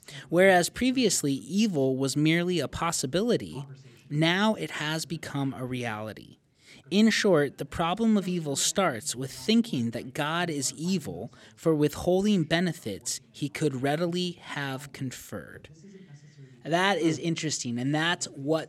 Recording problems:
voice in the background; faint; throughout; 25 dB below the speech

